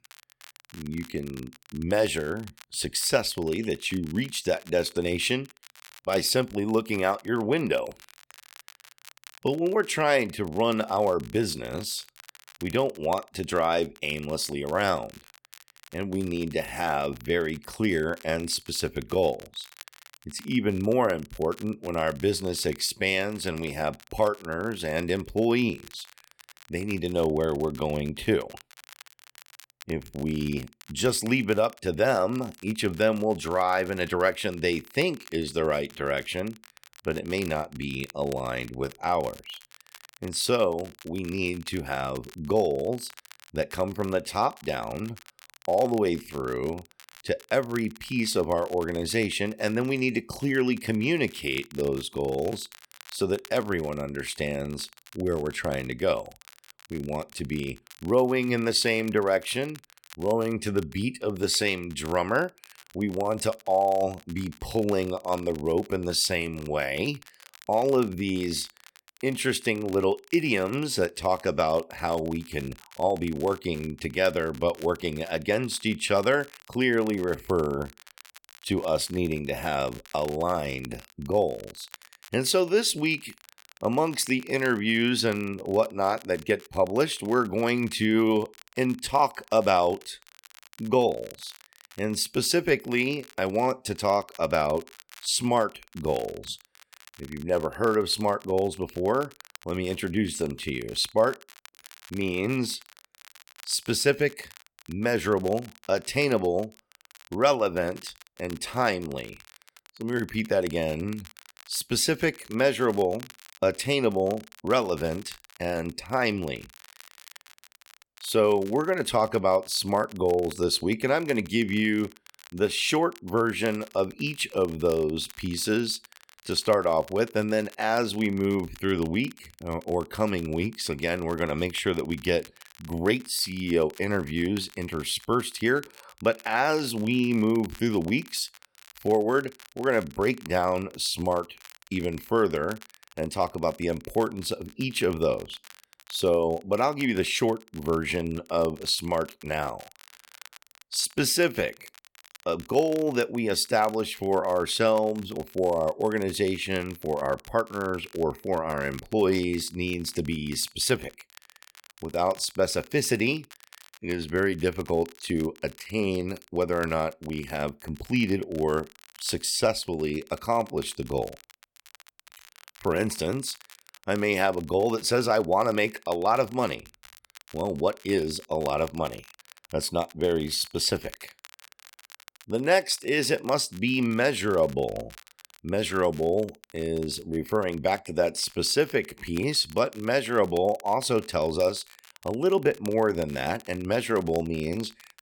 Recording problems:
crackle, like an old record; faint; 25 dB below the speech

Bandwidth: 18 kHz